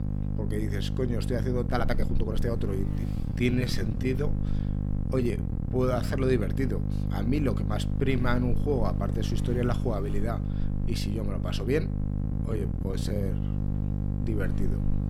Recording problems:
electrical hum; loud; throughout; 50 Hz, 7 dB below the speech
uneven, jittery; strongly; from 1.5 to 13 s

